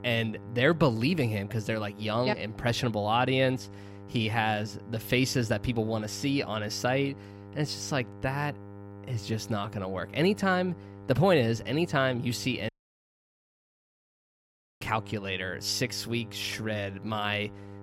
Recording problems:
electrical hum; faint; throughout; 50 Hz, 20 dB below the speech
audio cutting out; at 13 s for 2 s

